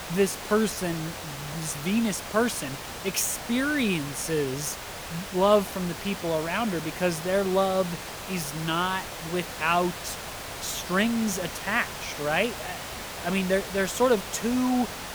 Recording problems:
hiss; loud; throughout; 9 dB below the speech

